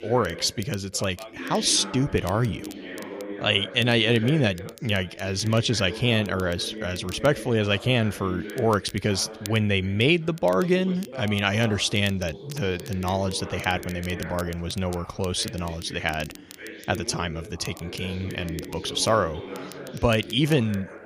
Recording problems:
background chatter; noticeable; throughout; 2 voices, 15 dB below the speech
crackle, like an old record; faint; 20 dB below the speech

